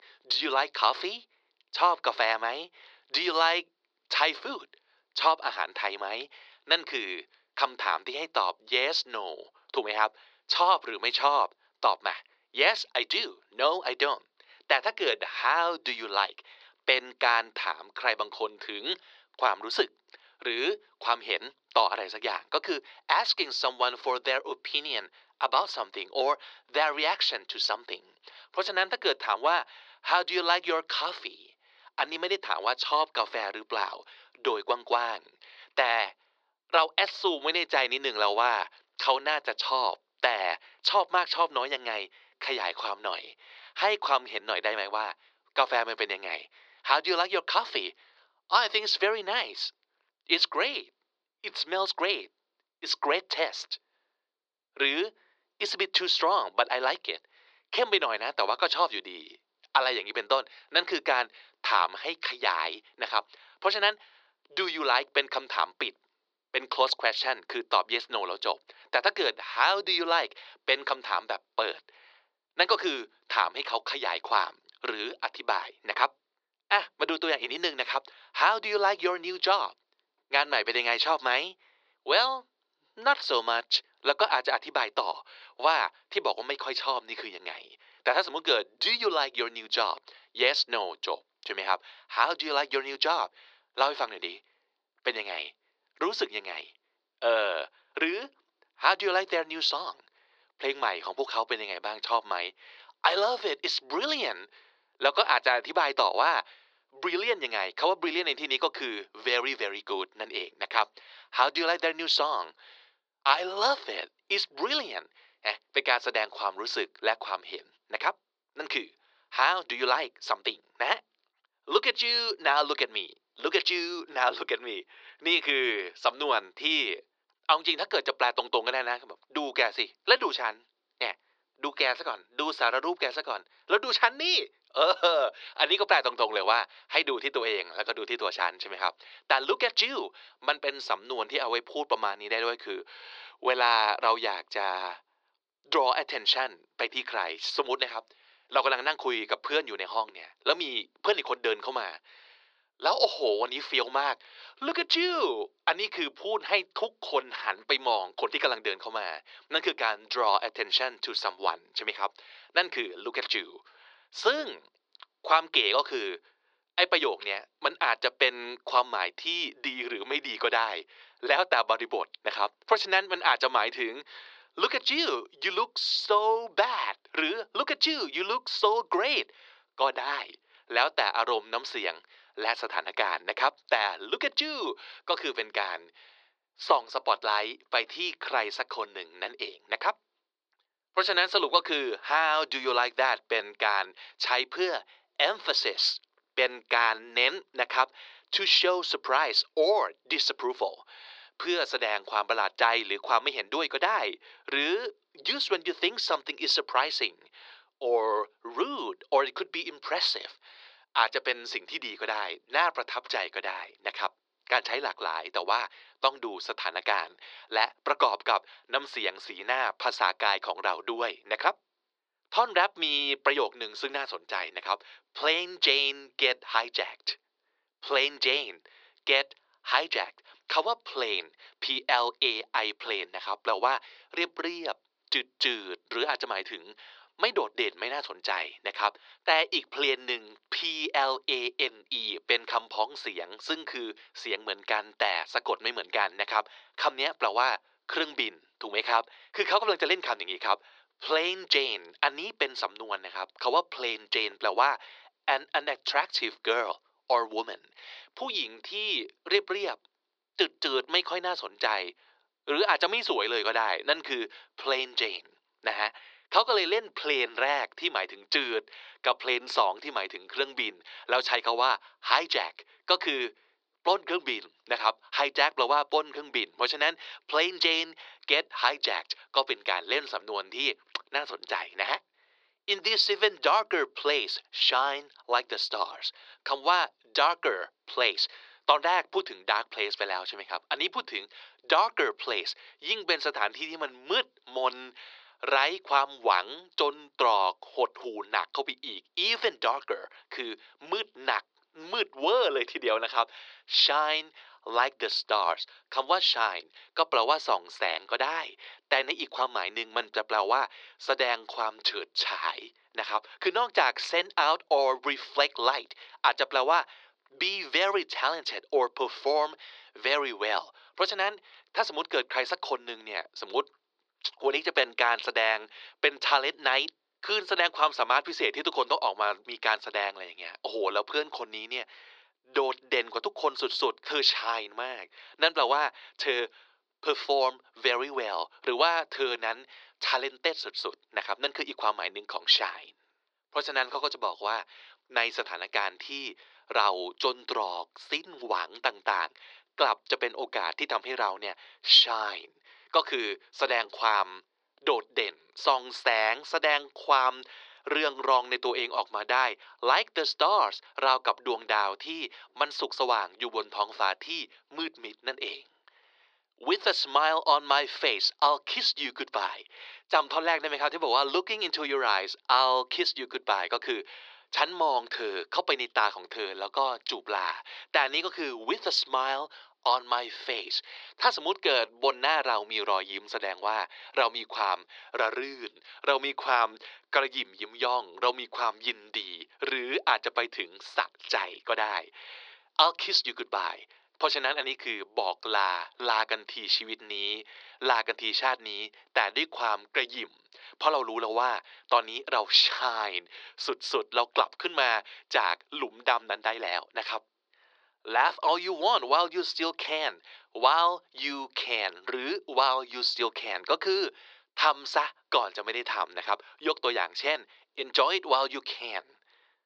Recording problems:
thin; very; fading below 400 Hz
muffled; very slightly; fading above 4 kHz

